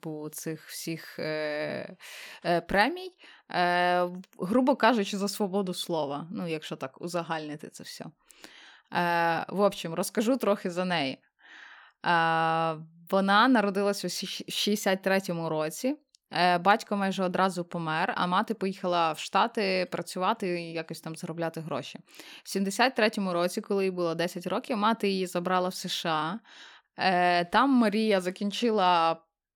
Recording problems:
none

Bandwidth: 18.5 kHz